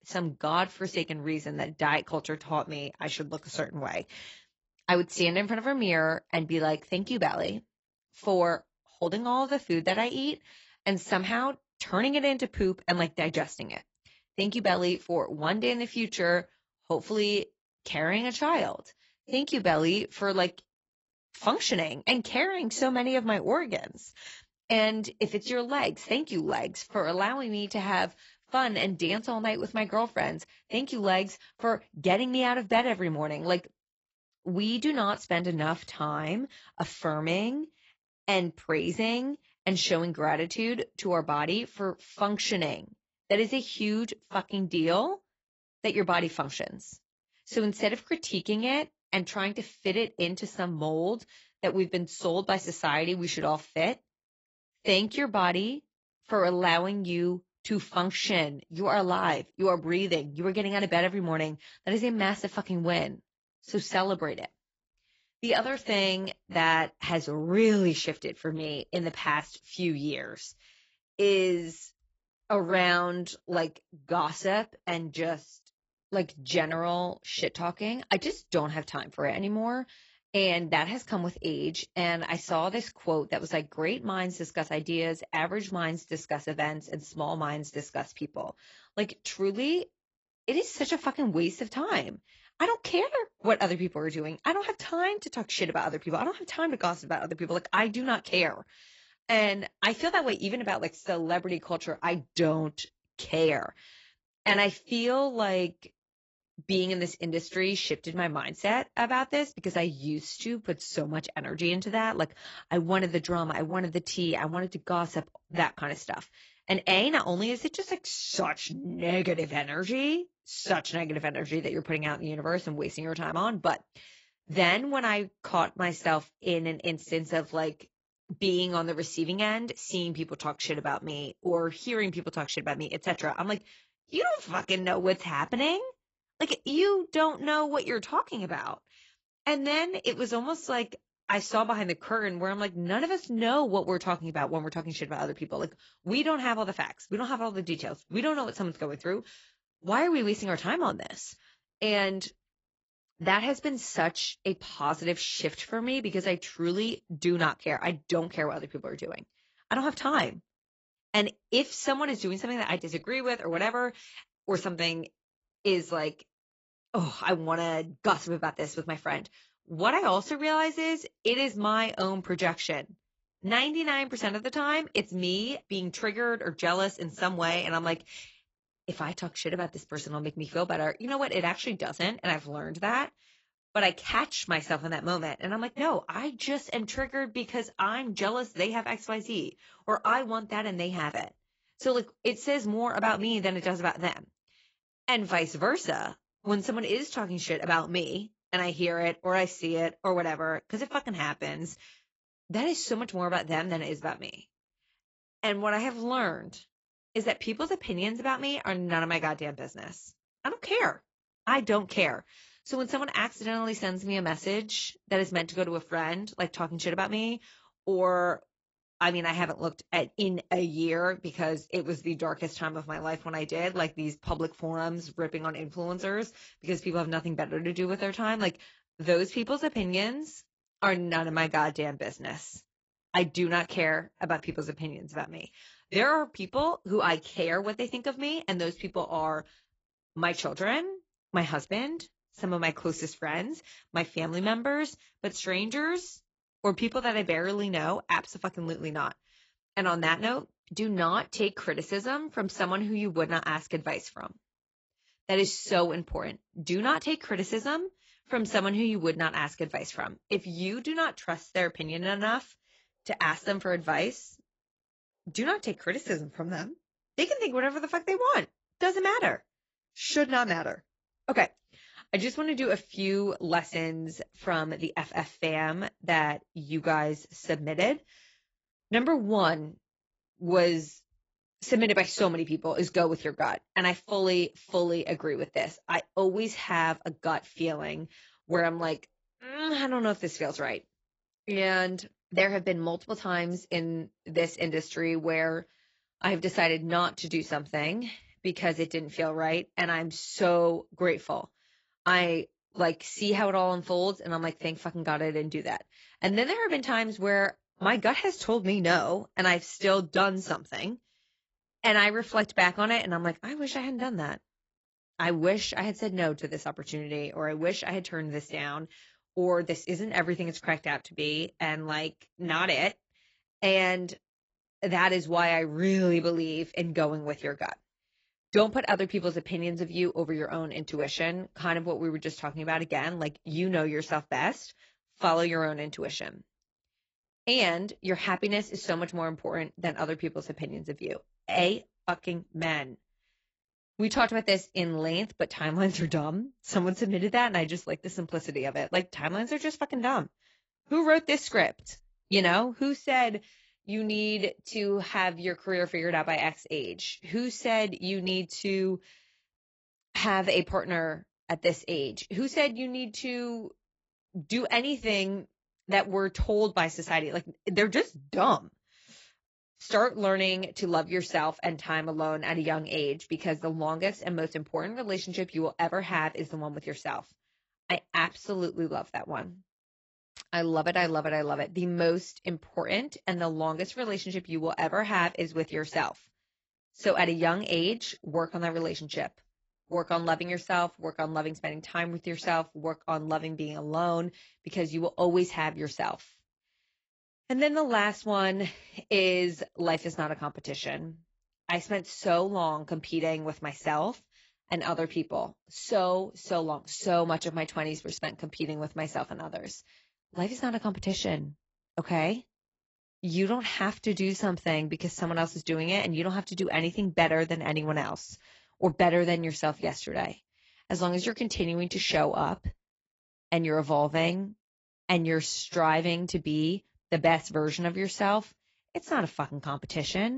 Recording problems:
garbled, watery; badly; nothing above 7.5 kHz
abrupt cut into speech; at the end

